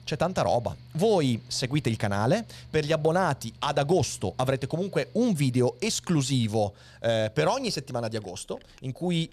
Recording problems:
machinery noise; faint; throughout; 25 dB below the speech

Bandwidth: 14 kHz